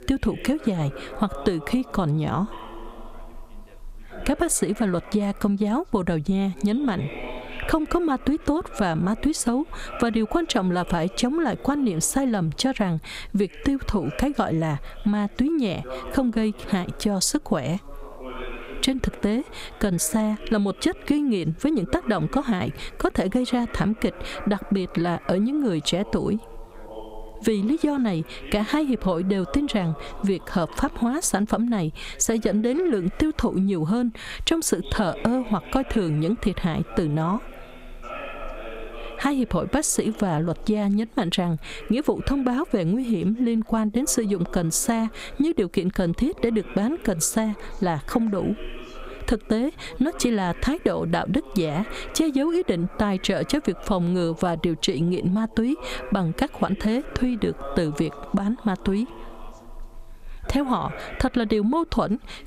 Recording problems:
squashed, flat; heavily, background pumping
background chatter; noticeable; throughout; 2 voices, 20 dB below the speech

